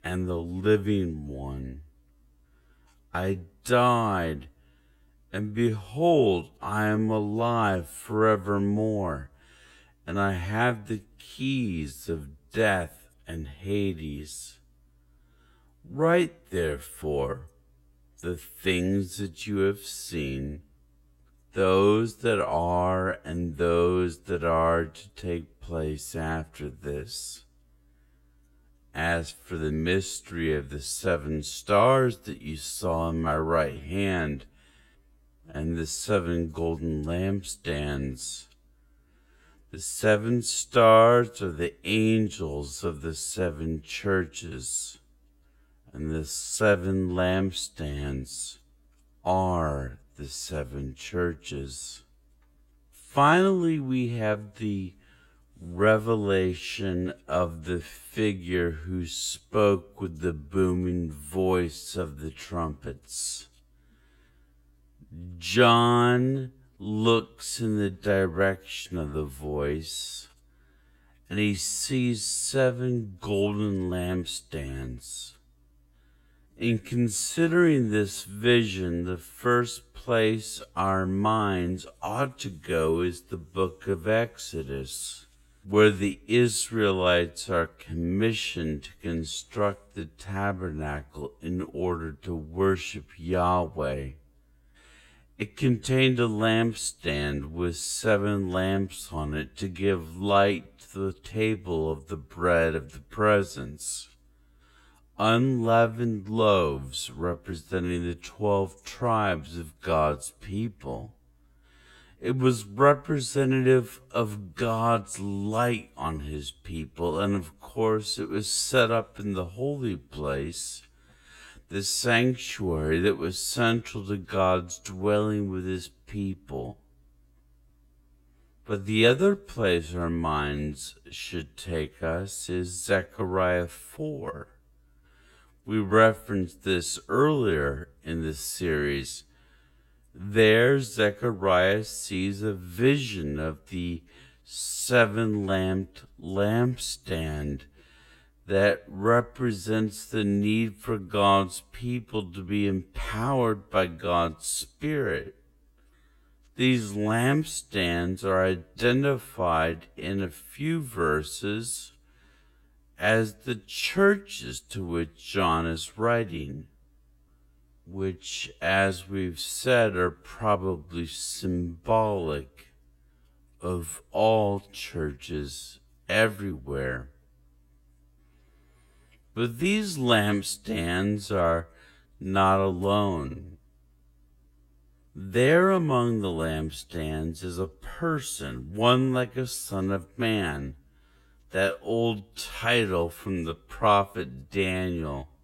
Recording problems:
wrong speed, natural pitch; too slow; 0.5 times normal speed

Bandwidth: 16 kHz